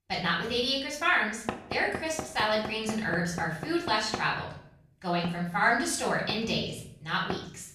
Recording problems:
off-mic speech; far
room echo; noticeable; dies away in 0.6 s
door banging; noticeable; from 1.5 s on; peak 8 dB below the speech

